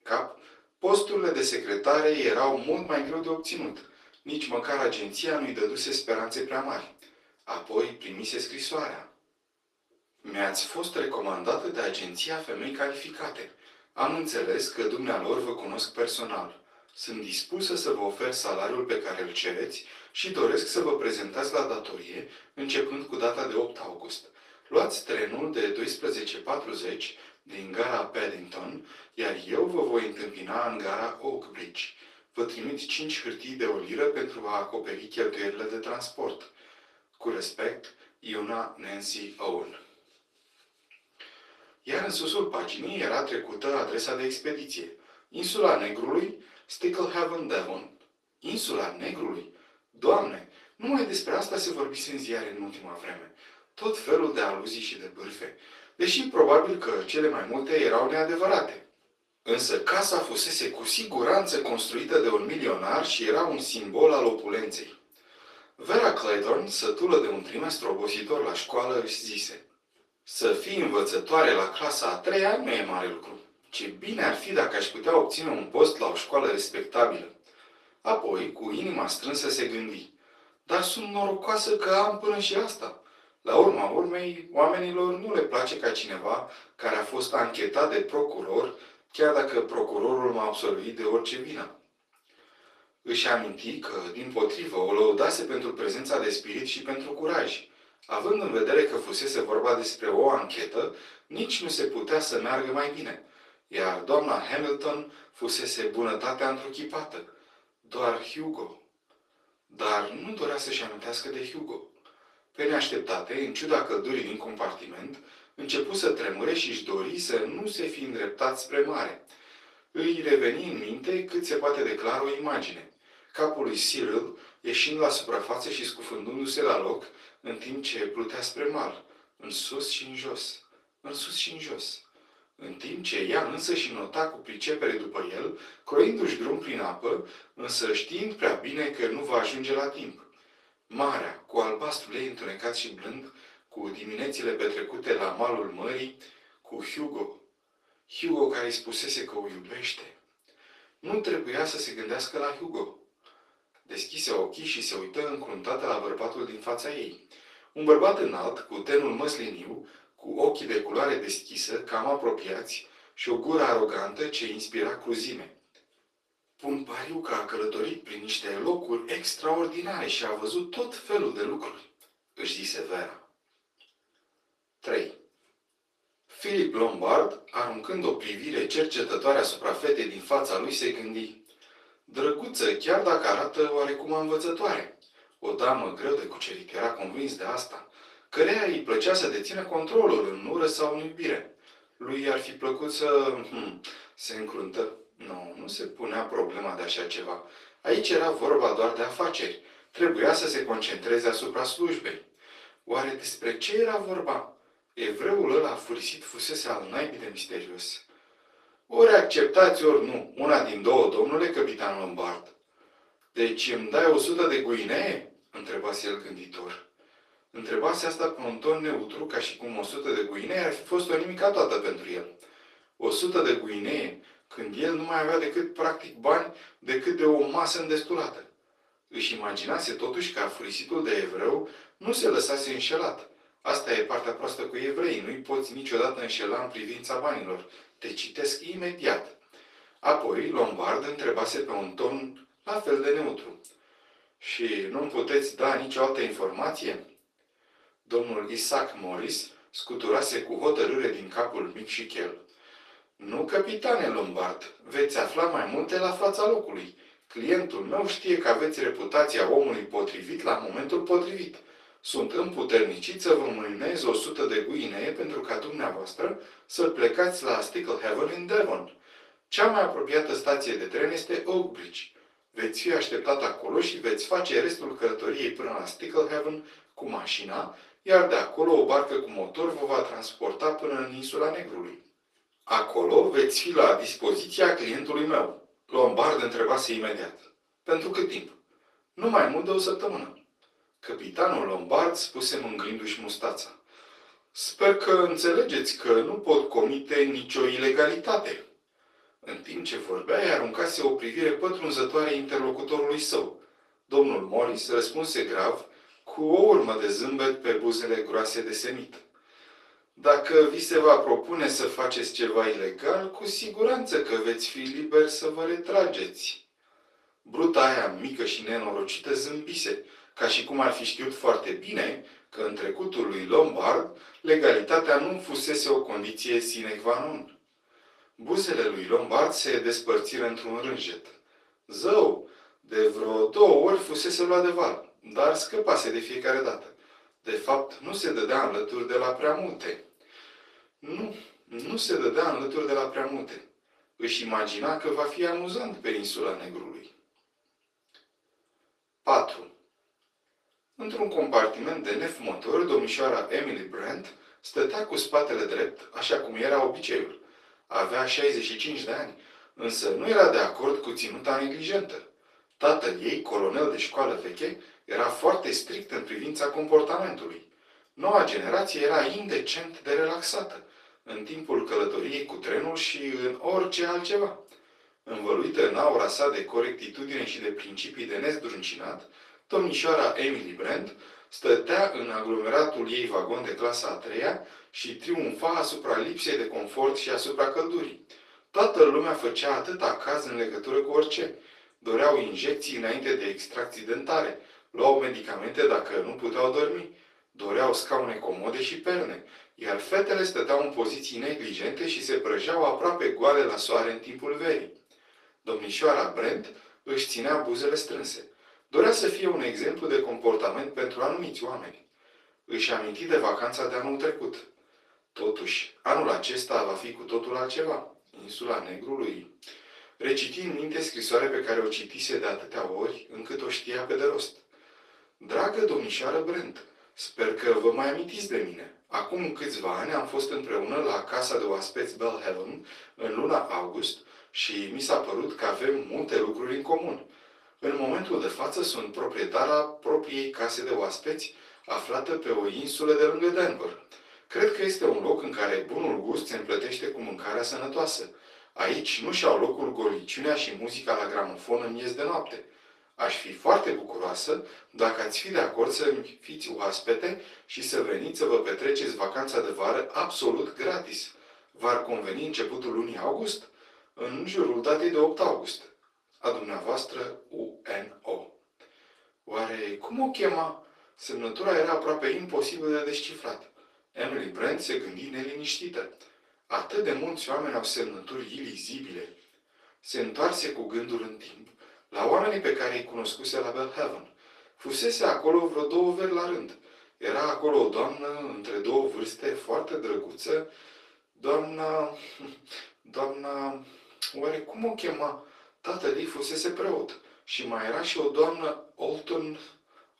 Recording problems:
off-mic speech; far
thin; very; fading below 400 Hz
room echo; slight; dies away in 0.3 s
garbled, watery; slightly; nothing above 12 kHz

